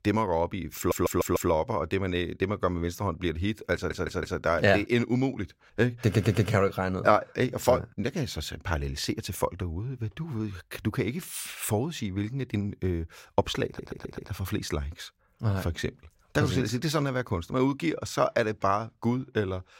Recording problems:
audio stuttering; 4 times, first at 1 s

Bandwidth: 16 kHz